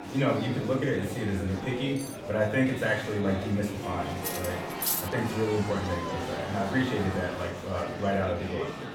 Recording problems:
off-mic speech; far
room echo; slight; dies away in 0.5 s
murmuring crowd; loud; throughout; 7 dB below the speech
background music; noticeable; throughout; 15 dB below the speech
clattering dishes; faint; at 2 s; peak 15 dB below the speech
clattering dishes; loud; at 4 s; peak 2 dB above the speech

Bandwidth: 17 kHz